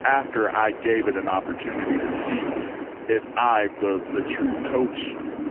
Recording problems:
phone-call audio; poor line; nothing above 3 kHz
wind in the background; loud; throughout; 7 dB below the speech

